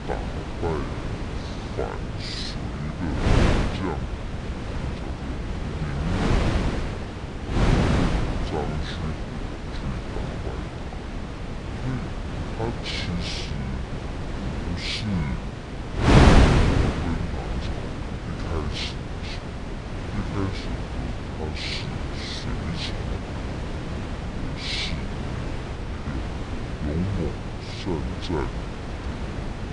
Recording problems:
wrong speed and pitch; too slow and too low; 0.6 times normal speed
wind noise on the microphone; heavy; 3 dB above the speech

